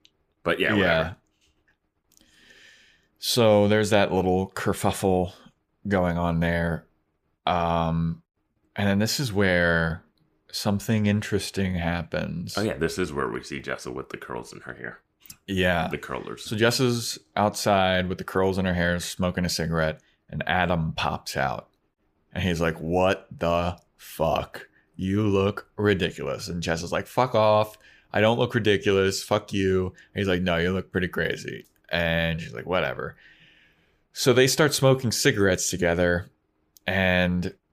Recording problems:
none

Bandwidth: 15 kHz